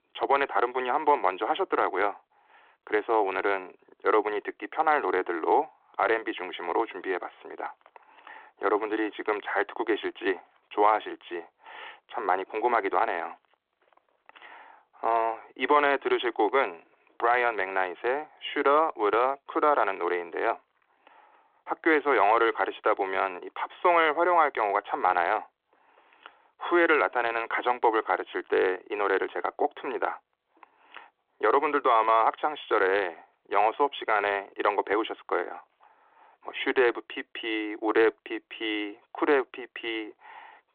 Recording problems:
phone-call audio

